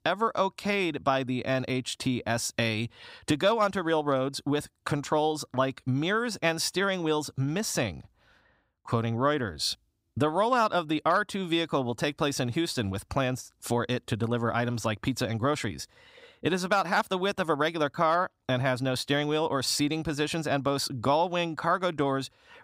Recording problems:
none

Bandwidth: 15.5 kHz